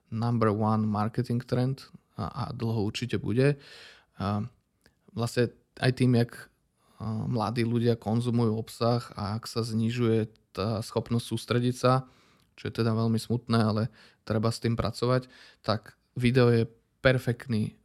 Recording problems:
none

